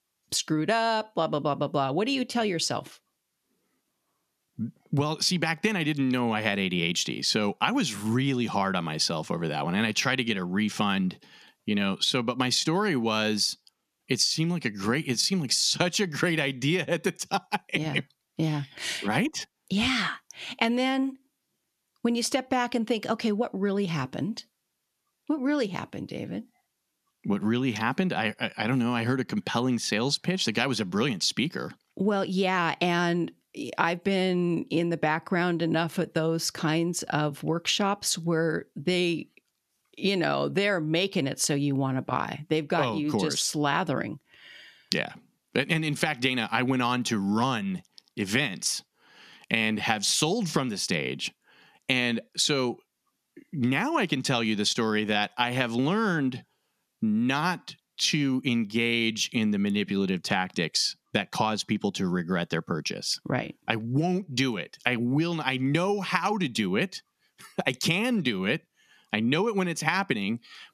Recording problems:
squashed, flat; somewhat

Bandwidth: 14 kHz